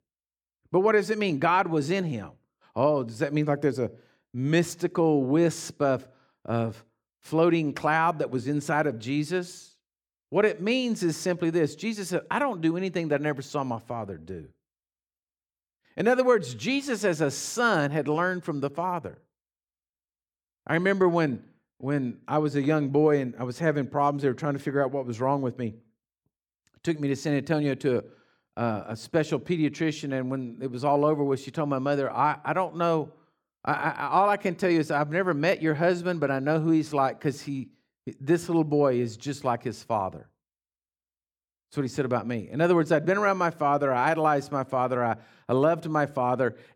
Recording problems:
none

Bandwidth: 18.5 kHz